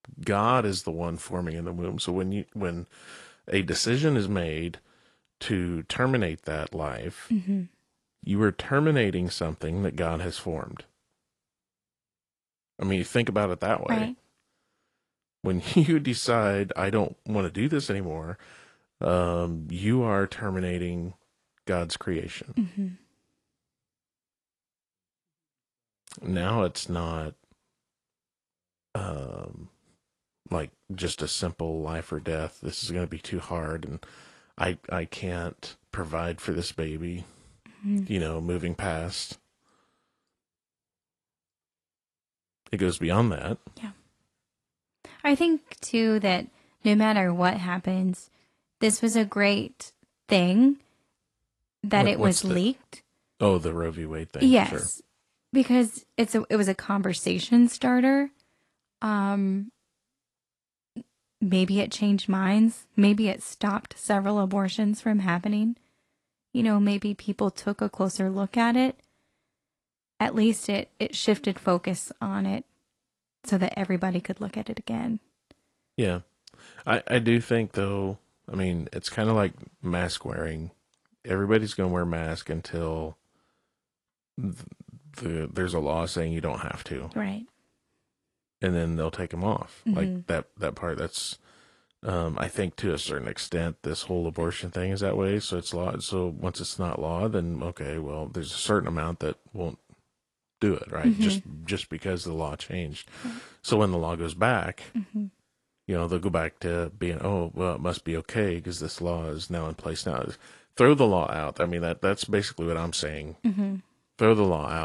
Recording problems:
garbled, watery; slightly
abrupt cut into speech; at the end

